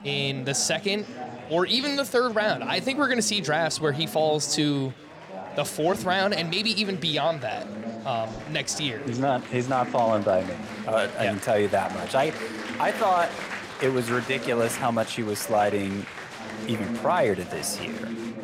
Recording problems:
murmuring crowd; noticeable; throughout; 10 dB below the speech

